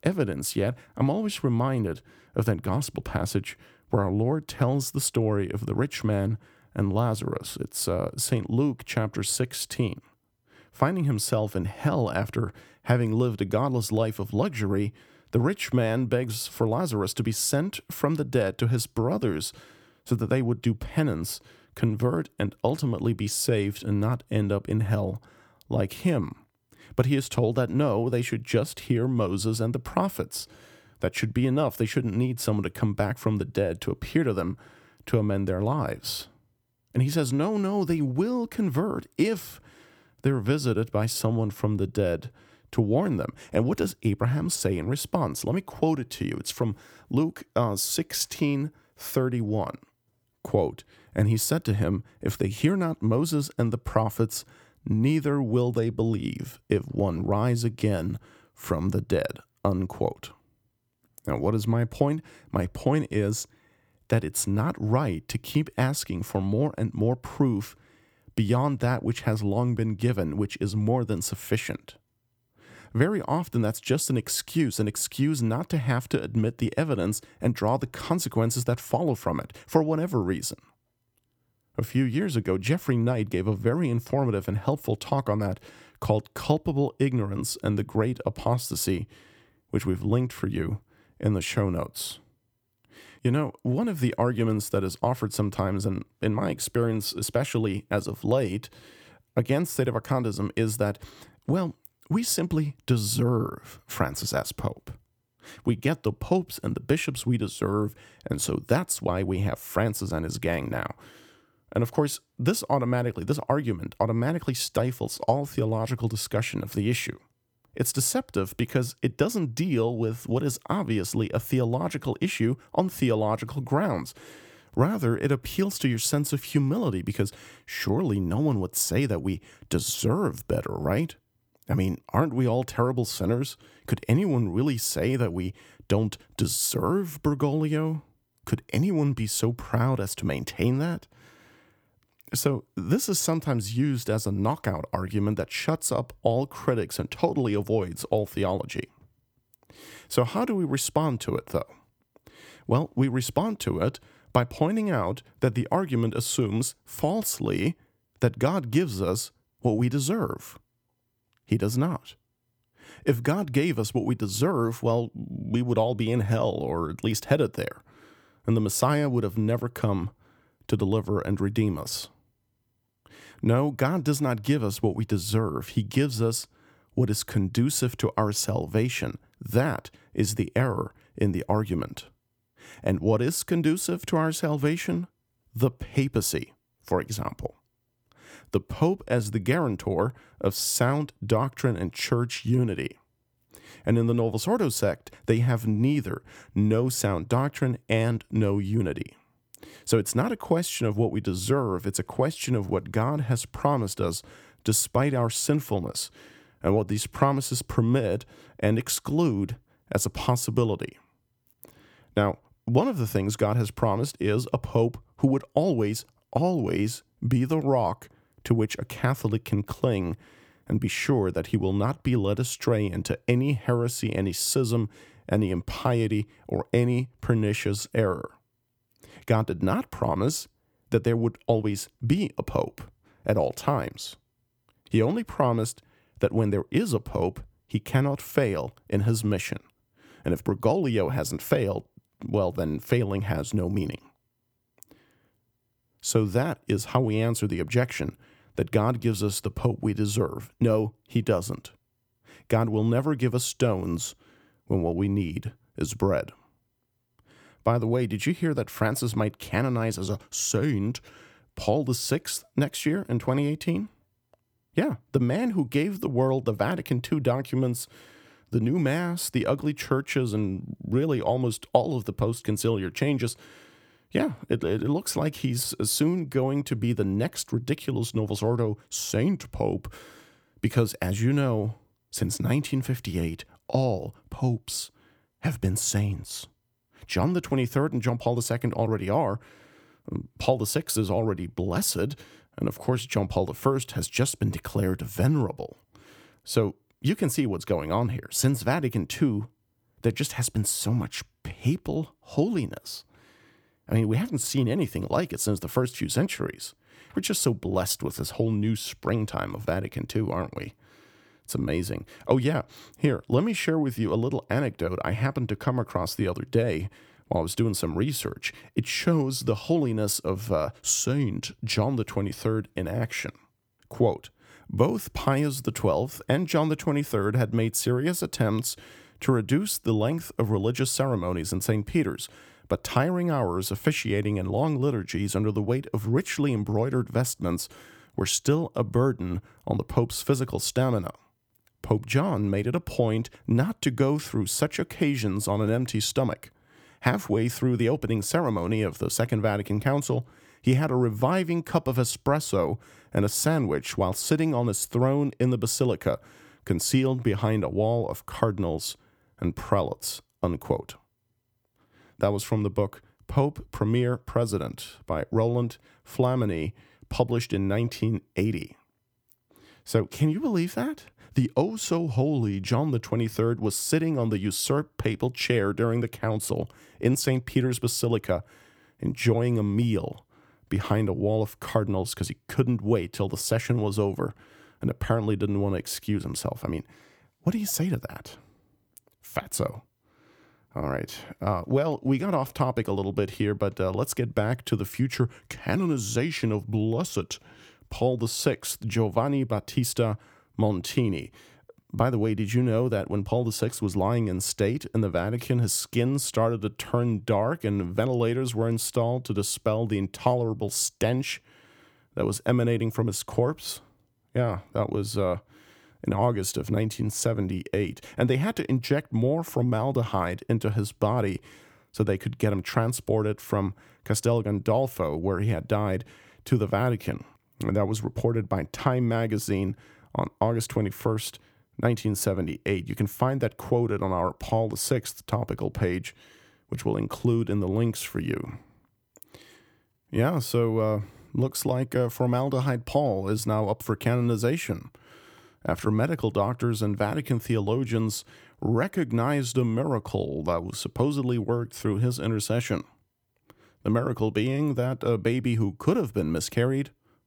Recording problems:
none

